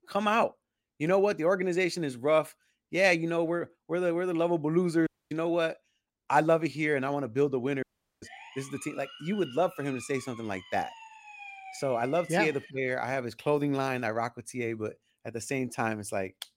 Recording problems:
audio cutting out; at 5 s and at 8 s
siren; faint; from 8 to 13 s; peak 15 dB below the speech

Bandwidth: 16 kHz